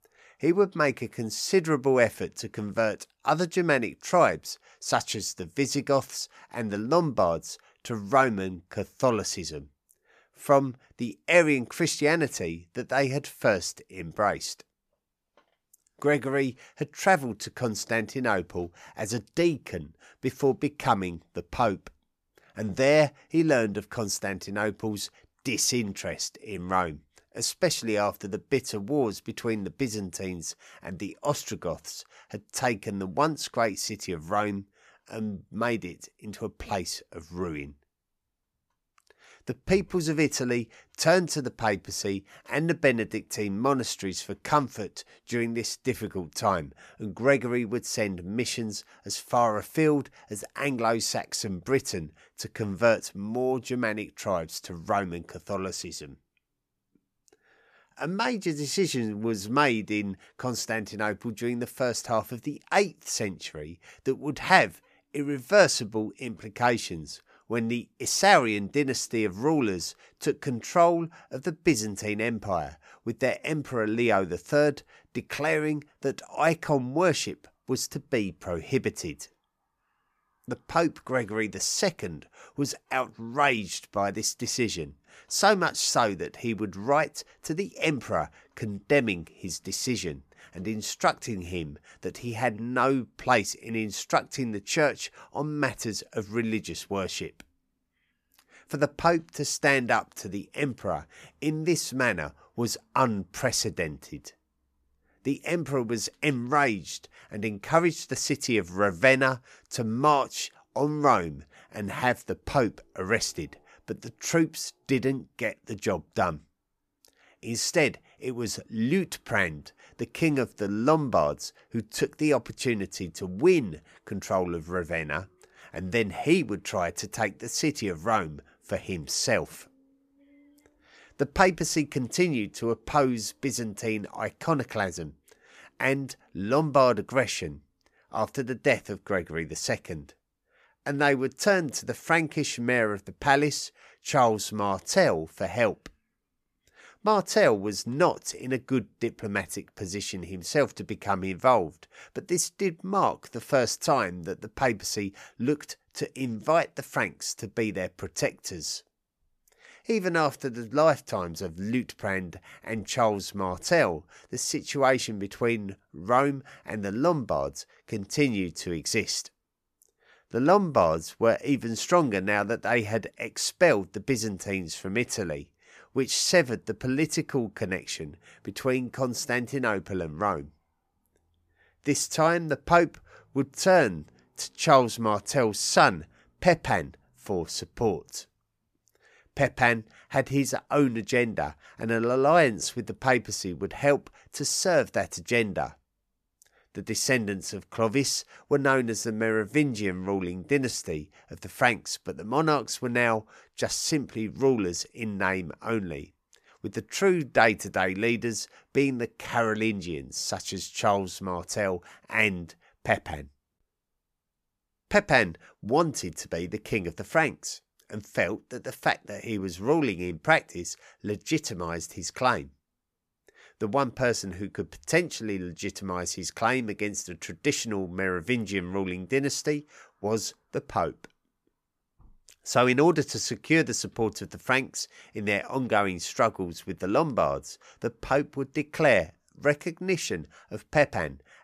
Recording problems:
none

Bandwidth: 14.5 kHz